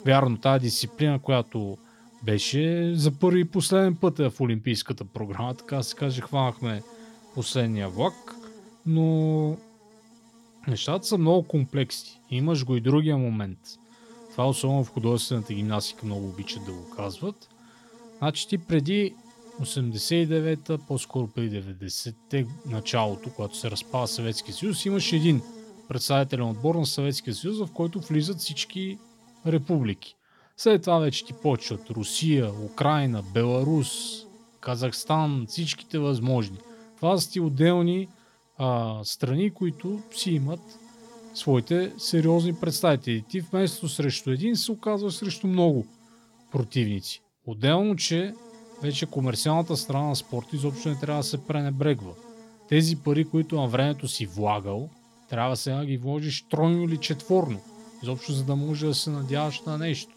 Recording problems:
electrical hum; faint; throughout; 60 Hz, 20 dB below the speech

